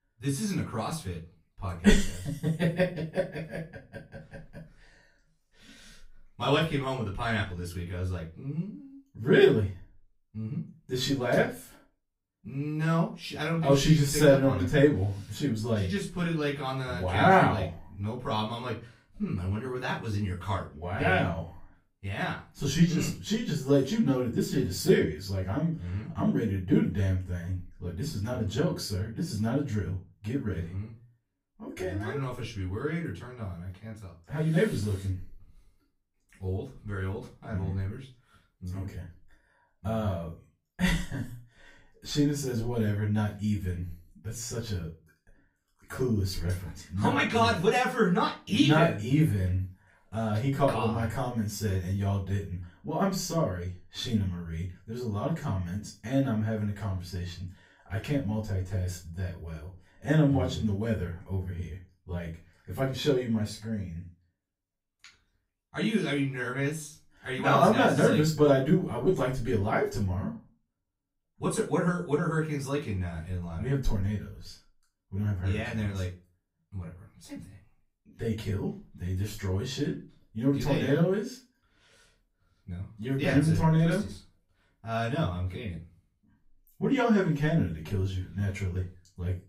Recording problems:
off-mic speech; far
room echo; slight; dies away in 0.3 s

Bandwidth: 15.5 kHz